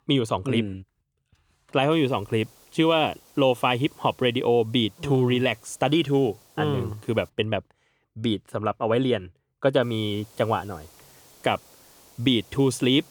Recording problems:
hiss; faint; from 2 to 7.5 s and from 10 s on; 30 dB below the speech

